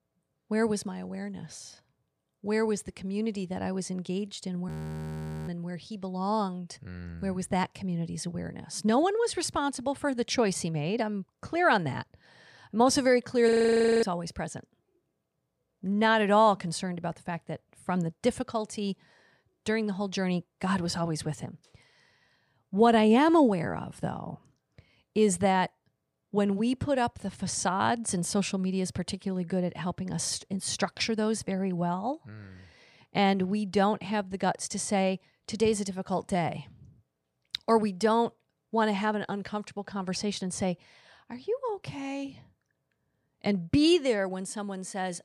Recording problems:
audio freezing; at 4.5 s for 1 s and at 13 s for 0.5 s

